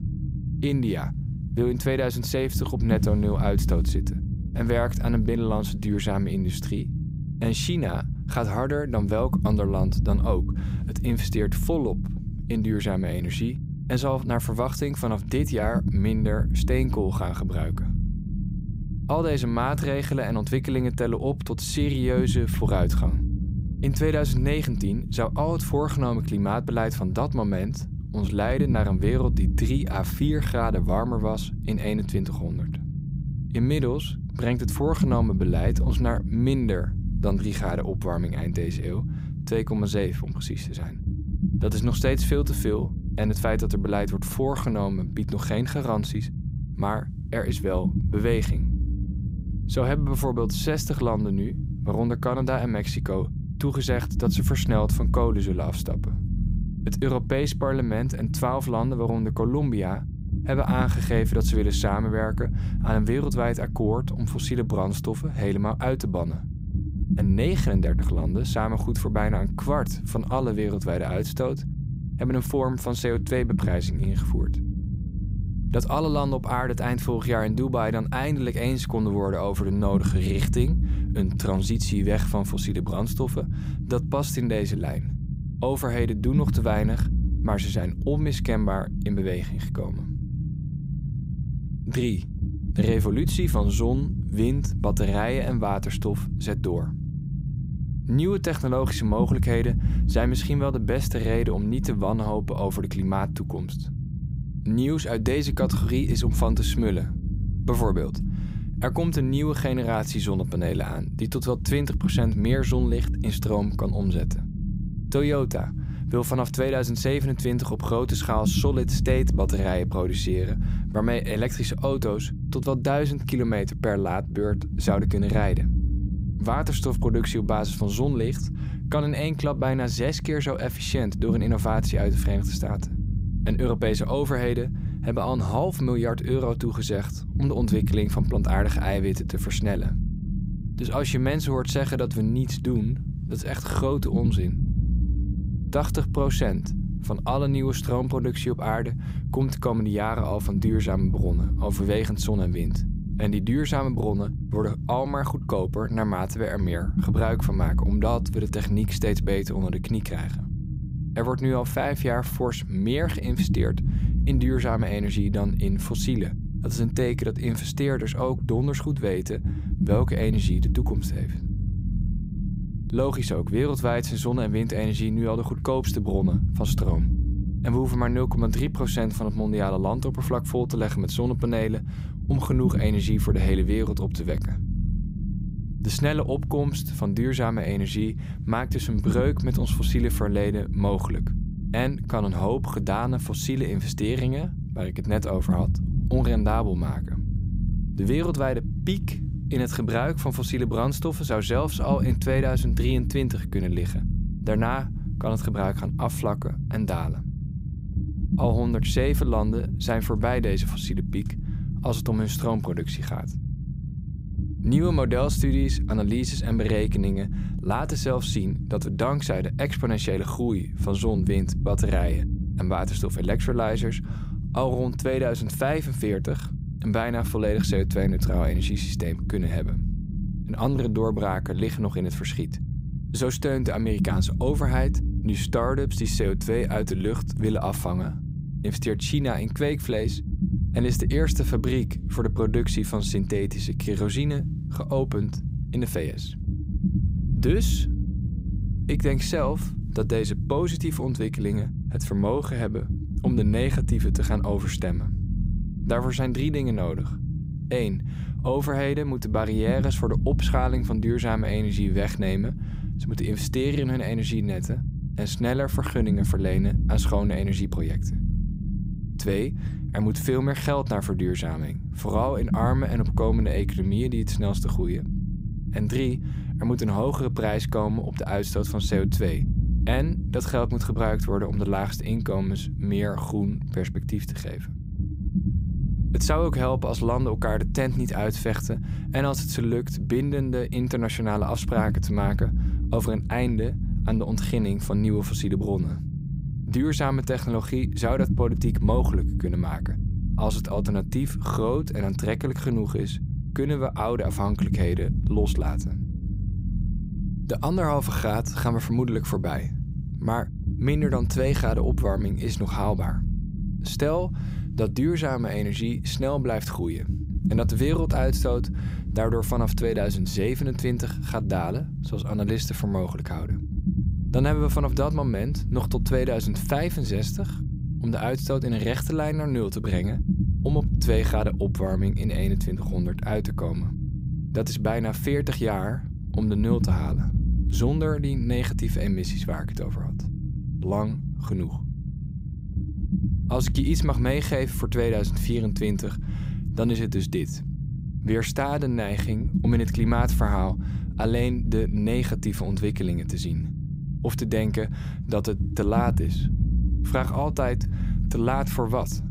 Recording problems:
low rumble; noticeable; throughout; 10 dB below the speech

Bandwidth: 15.5 kHz